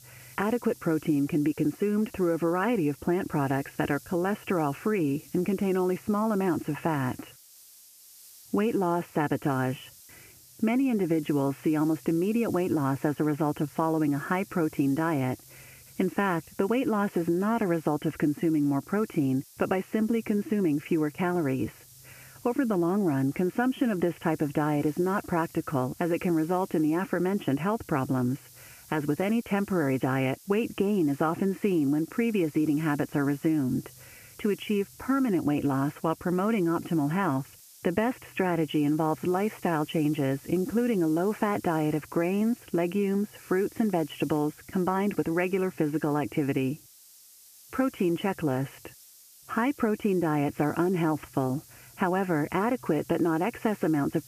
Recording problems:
high frequencies cut off; severe; nothing above 3 kHz
squashed, flat; somewhat
hiss; faint; throughout; 20 dB below the speech

